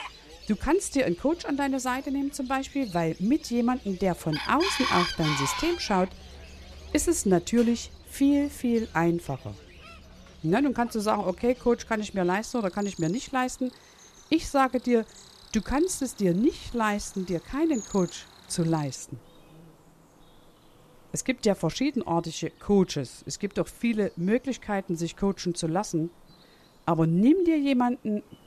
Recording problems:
animal sounds; noticeable; throughout; 10 dB below the speech

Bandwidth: 14 kHz